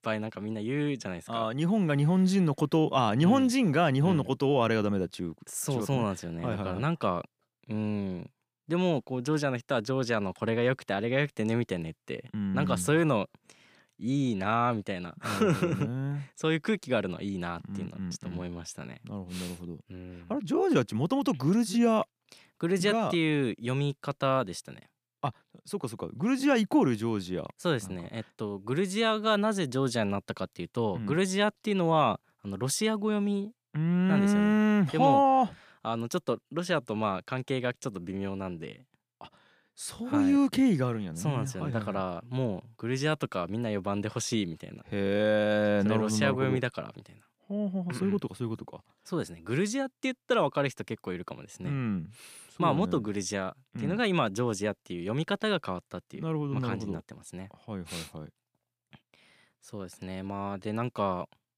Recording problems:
none

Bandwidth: 15 kHz